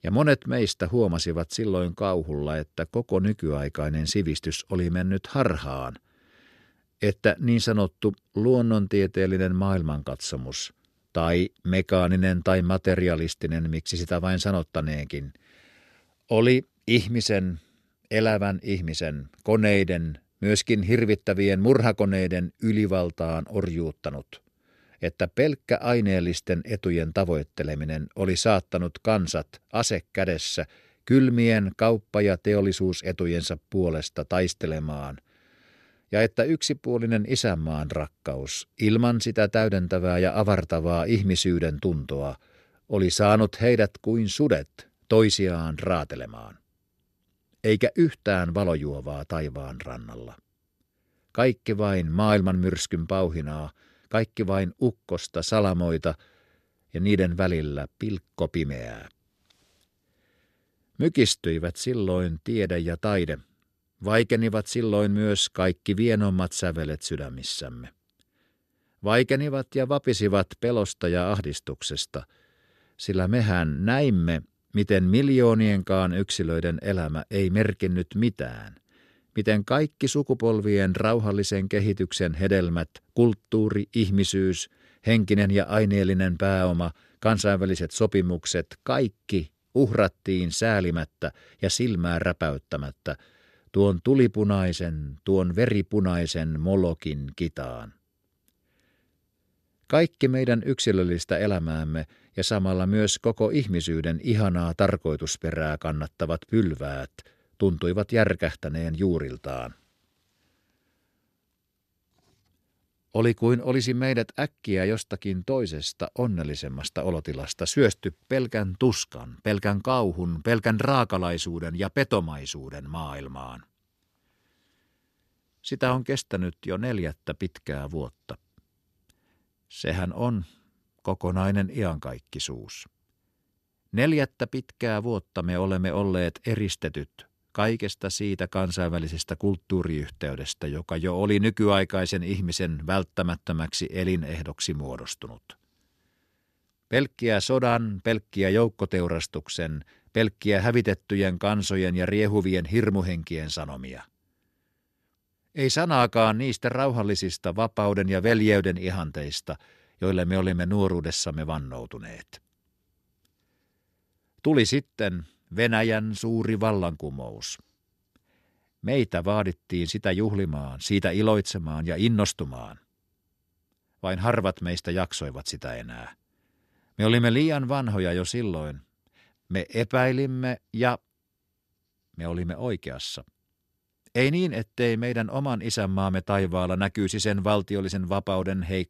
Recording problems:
none

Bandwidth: 13.5 kHz